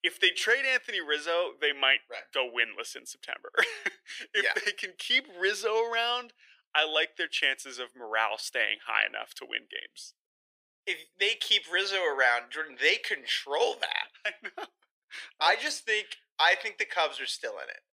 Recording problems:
thin; very; fading below 450 Hz

